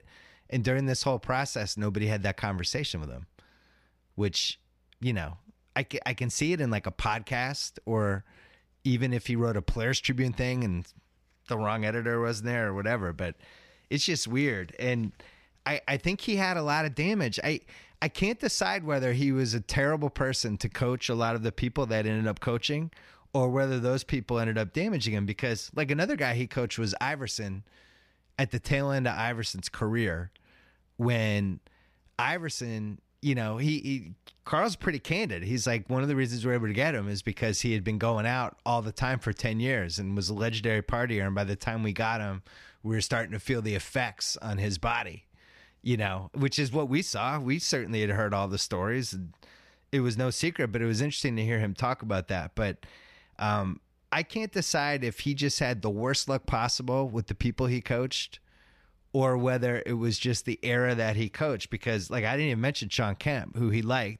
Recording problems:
none

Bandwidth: 15 kHz